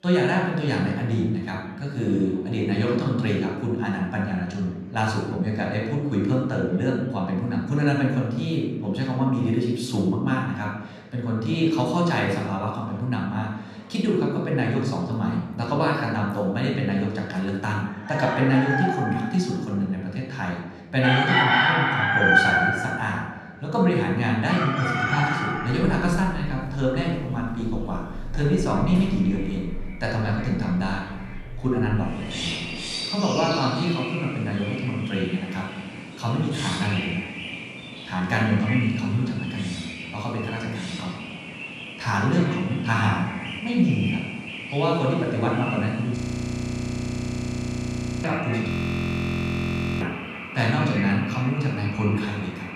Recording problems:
off-mic speech; far
echo of what is said; noticeable; from 28 s on; 180 ms later, 15 dB below the speech
room echo; noticeable; dies away in 0.9 s
animal sounds; loud; from 18 s on; 4 dB below the speech
chatter from many people; faint; throughout; 25 dB below the speech
audio freezing; at 46 s for 2 s and at 49 s for 1.5 s

